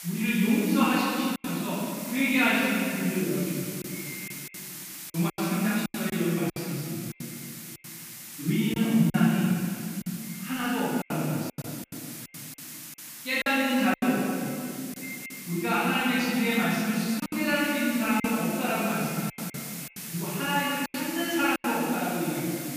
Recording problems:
room echo; strong; dies away in 2.5 s
off-mic speech; far
echo of what is said; faint; throughout; 570 ms later, 20 dB below the speech
hiss; noticeable; throughout; 10 dB below the speech
choppy; very; 7% of the speech affected

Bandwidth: 15 kHz